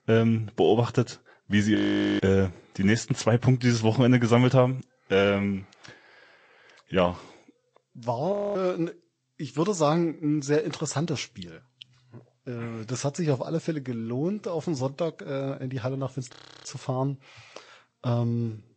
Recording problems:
garbled, watery; slightly; nothing above 8 kHz
audio freezing; at 2 s, at 8.5 s and at 16 s

